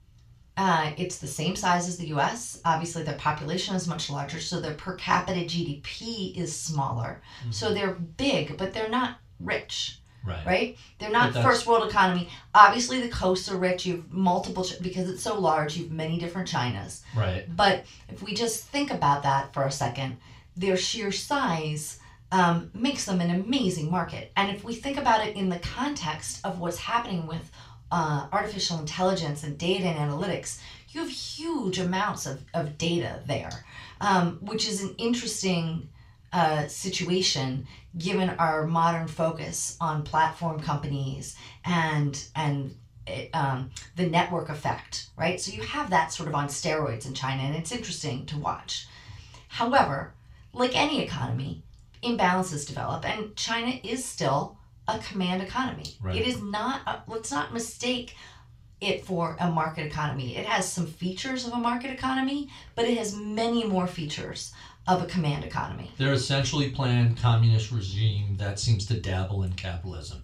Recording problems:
off-mic speech; far
room echo; slight; dies away in 0.3 s

